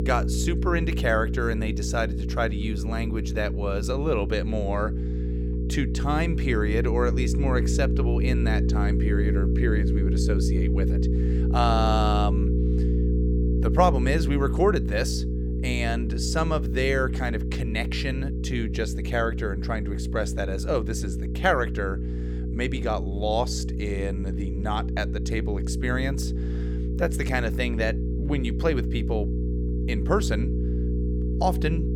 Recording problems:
electrical hum; loud; throughout; 60 Hz, 8 dB below the speech

